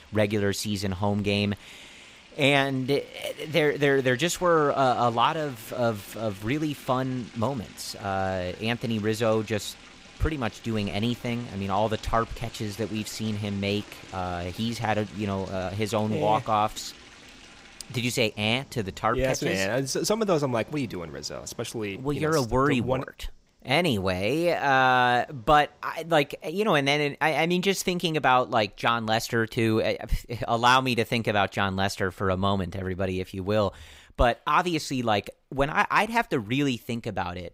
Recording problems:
rain or running water; faint; throughout; 20 dB below the speech

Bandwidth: 15.5 kHz